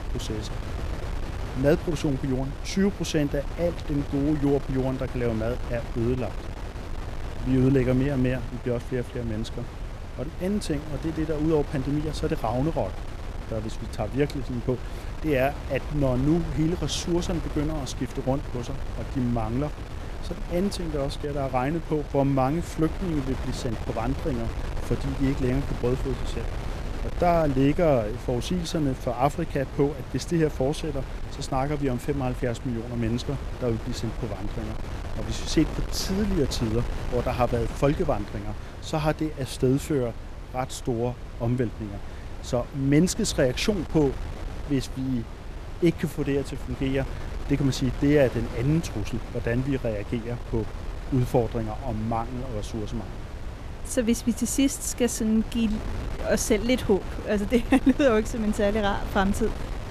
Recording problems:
wind noise on the microphone; occasional gusts; 10 dB below the speech

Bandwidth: 14.5 kHz